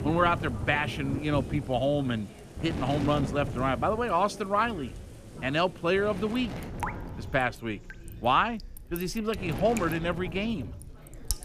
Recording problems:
rain or running water; noticeable; throughout; 10 dB below the speech
wind noise on the microphone; occasional gusts; 15 dB below the speech
background chatter; faint; throughout; 4 voices, 25 dB below the speech

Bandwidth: 14.5 kHz